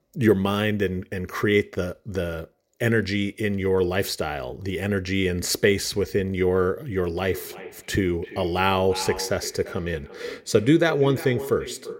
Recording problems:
echo of what is said; noticeable; from 7 s on; 340 ms later, 15 dB below the speech

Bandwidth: 16 kHz